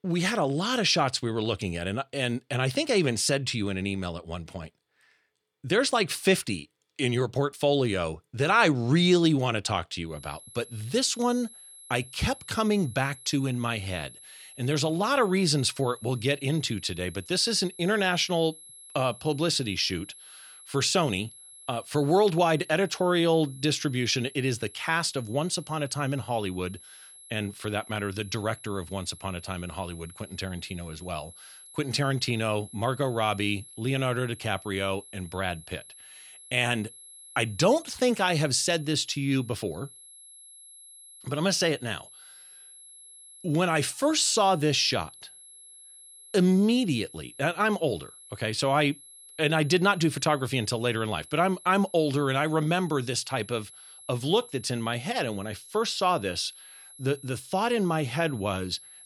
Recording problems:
high-pitched whine; noticeable; from 10 s on; 11 kHz, 20 dB below the speech

